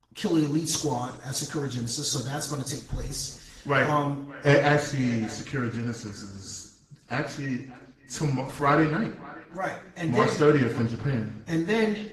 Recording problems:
echo of what is said; faint; throughout; 580 ms later, 25 dB below the speech
room echo; slight; dies away in 0.6 s
off-mic speech; somewhat distant
garbled, watery; slightly; nothing above 12 kHz

